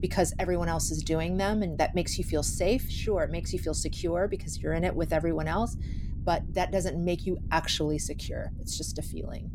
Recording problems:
low rumble; faint; throughout; 20 dB below the speech

